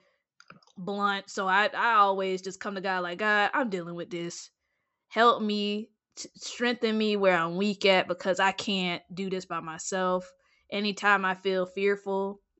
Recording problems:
high frequencies cut off; noticeable; nothing above 7.5 kHz

